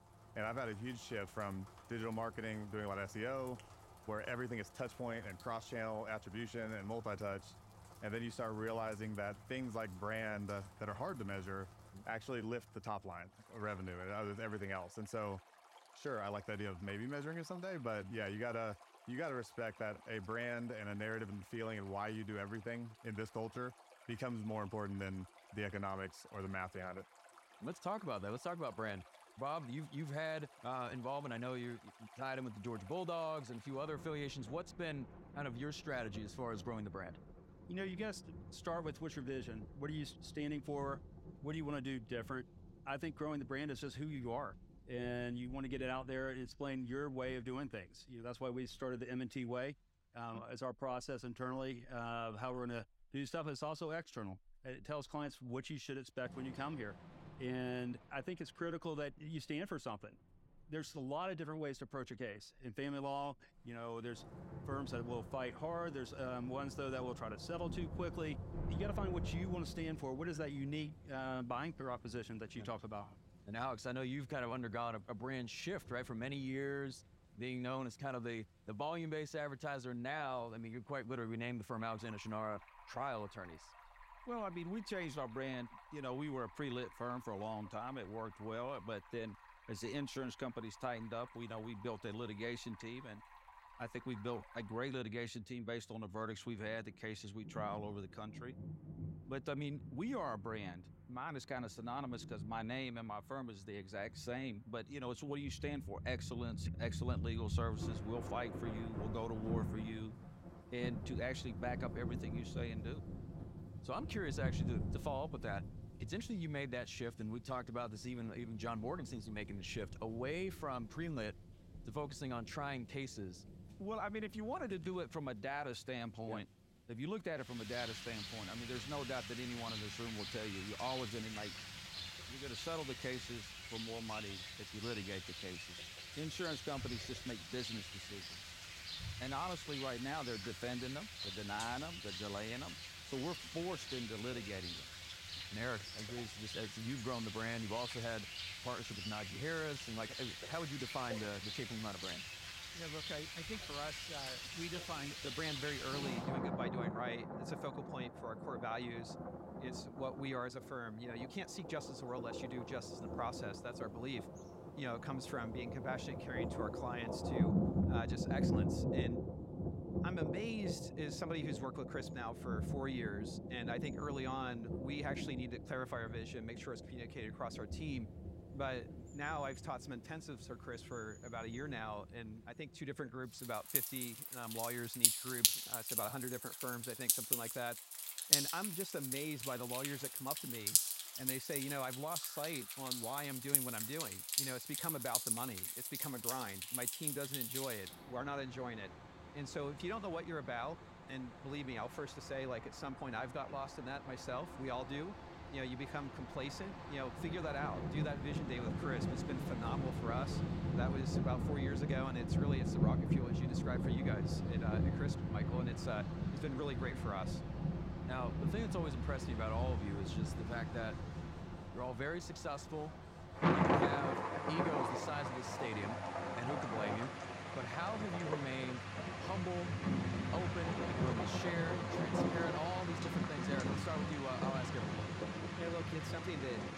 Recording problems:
rain or running water; very loud; throughout; 3 dB above the speech

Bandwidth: 16 kHz